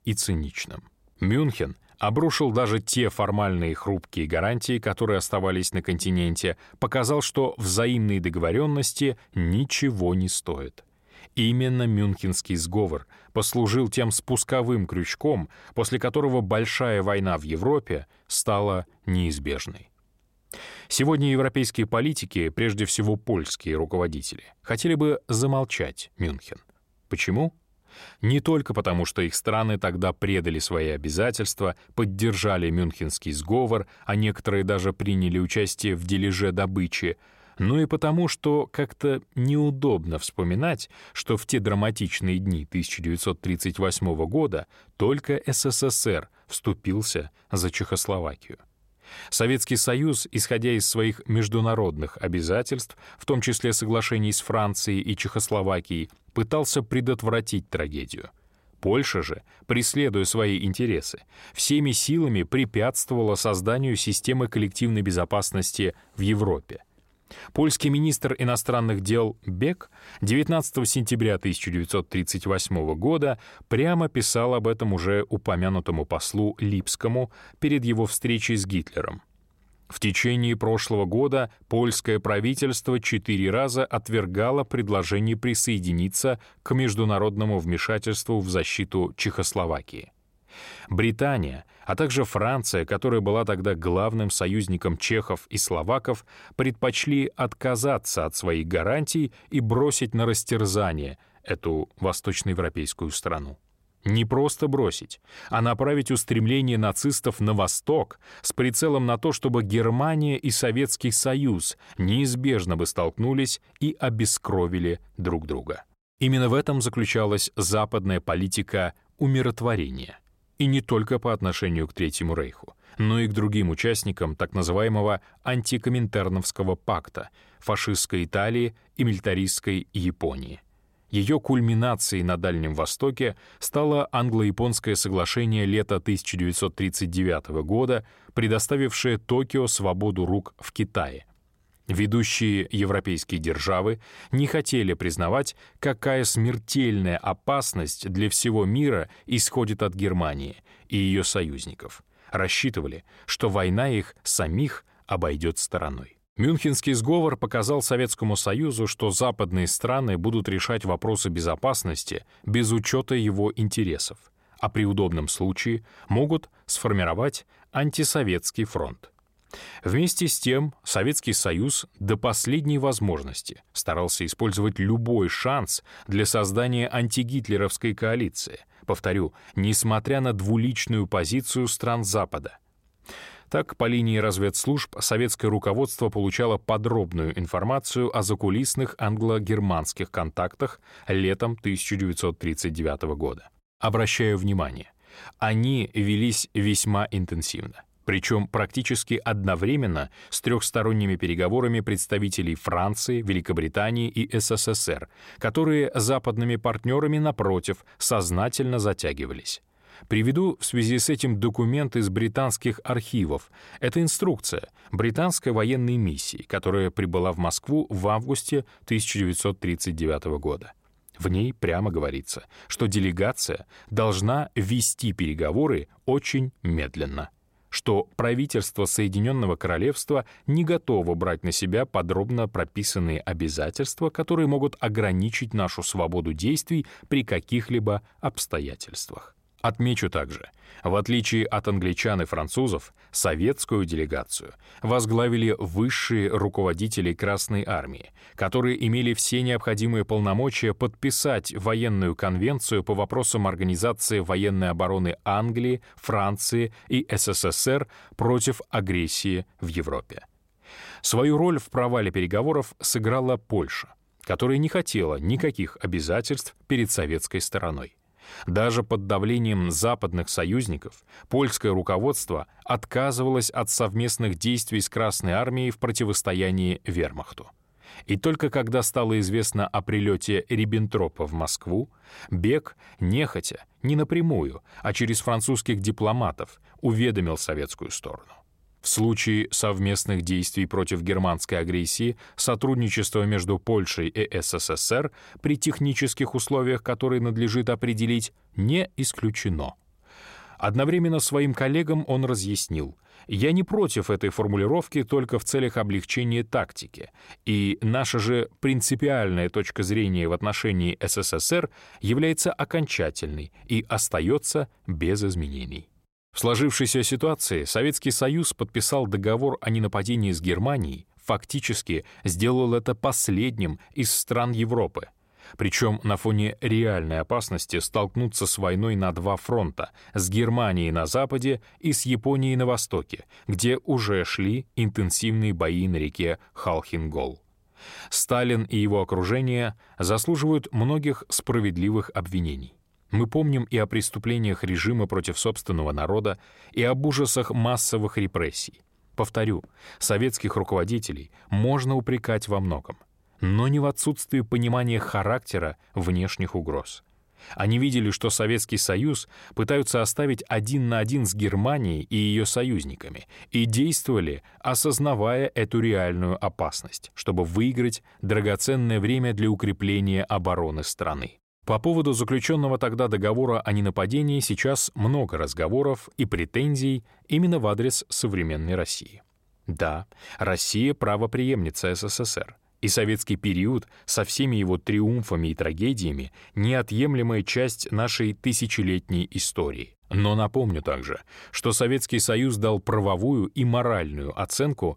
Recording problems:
none

